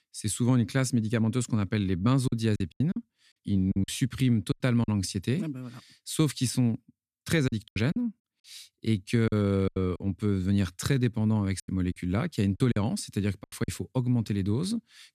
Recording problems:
choppy; very; from 2.5 to 5 s, from 7.5 to 10 s and from 12 to 14 s; 14% of the speech affected

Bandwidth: 14.5 kHz